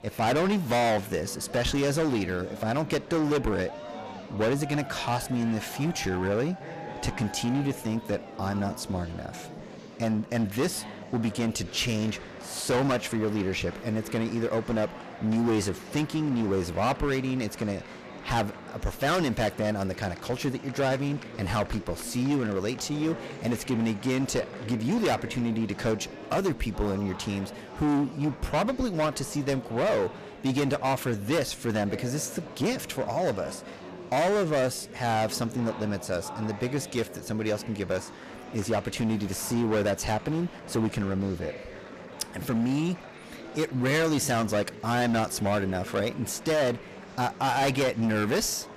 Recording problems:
distortion; heavy; 12% of the sound clipped
murmuring crowd; noticeable; throughout; 15 dB below the speech

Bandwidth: 14.5 kHz